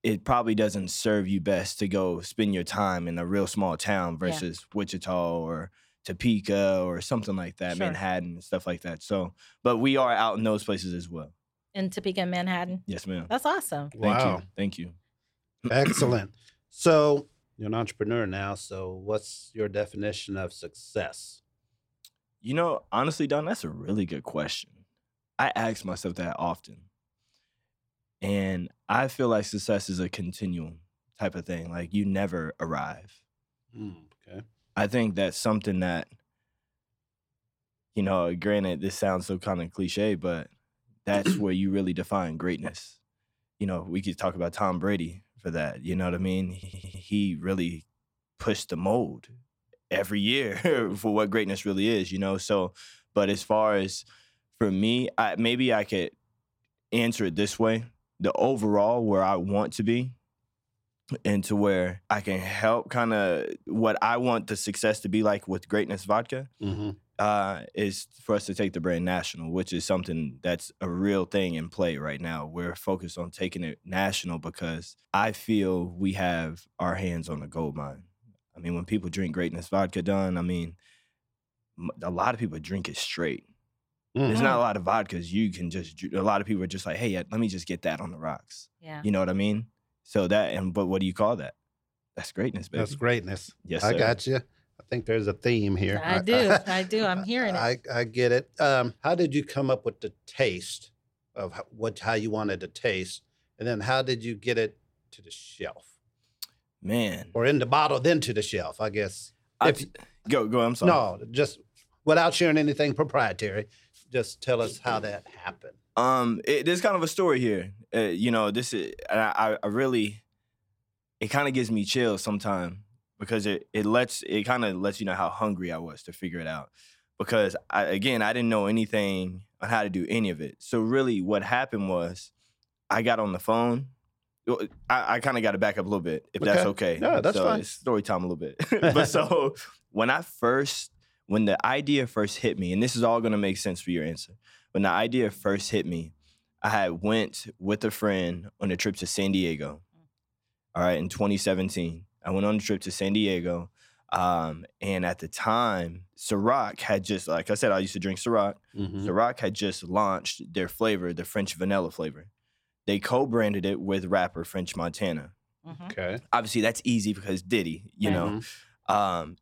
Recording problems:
audio stuttering; at 47 s

